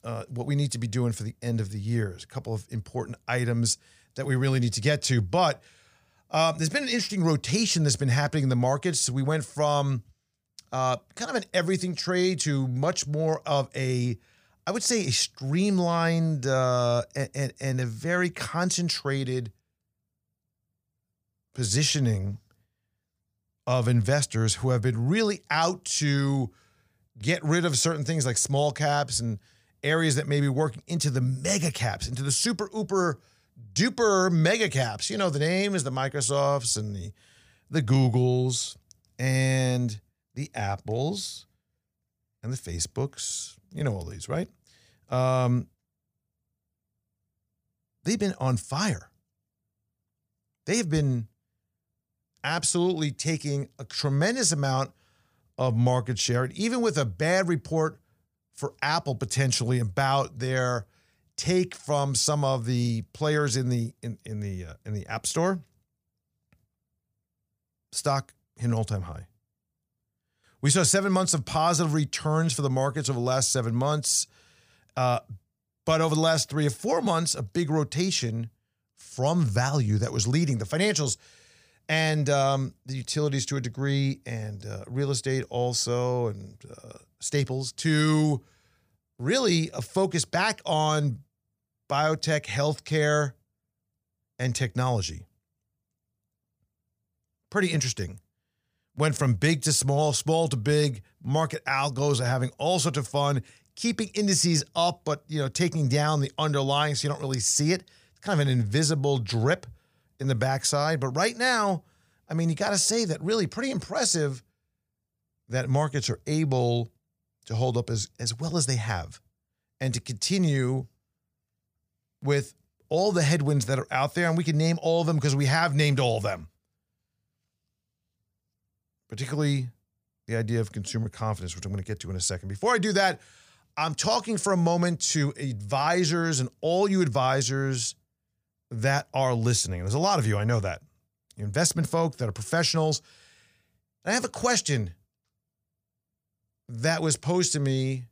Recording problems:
none

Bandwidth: 15 kHz